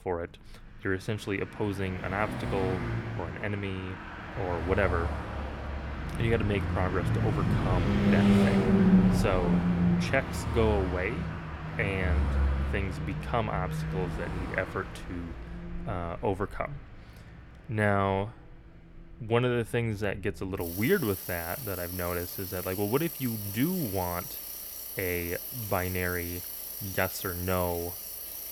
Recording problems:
traffic noise; very loud; throughout; 1 dB above the speech

